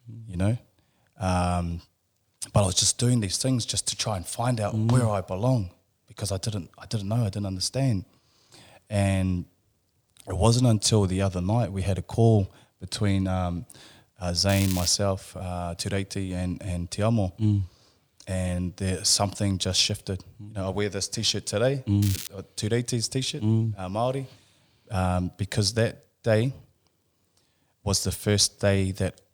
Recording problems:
crackling; loud; at 14 s and at 22 s; 9 dB below the speech

